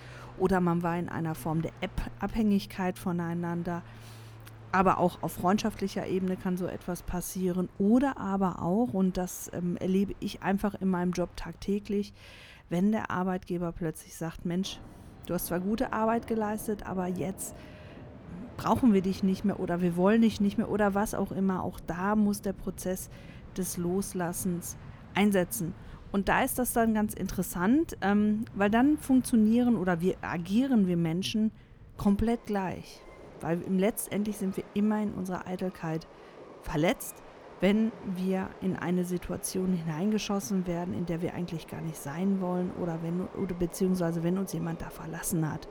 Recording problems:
train or aircraft noise; noticeable; throughout; 20 dB below the speech

